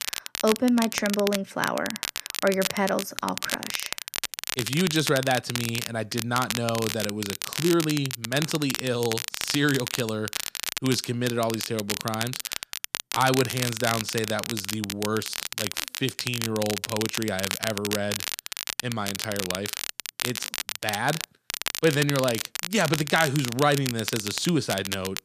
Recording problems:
crackle, like an old record; loud; 4 dB below the speech

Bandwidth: 14.5 kHz